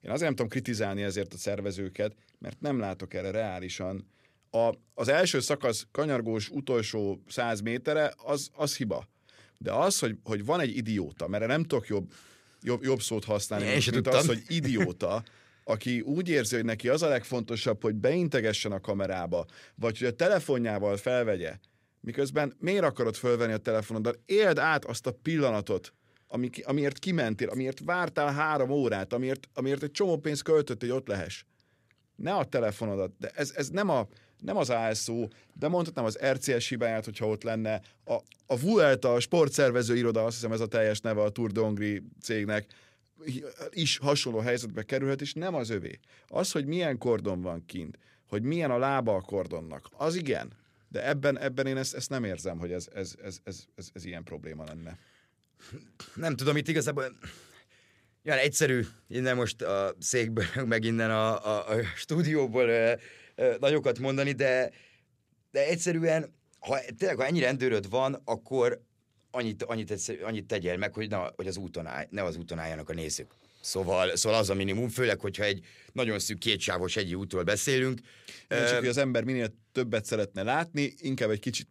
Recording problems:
none

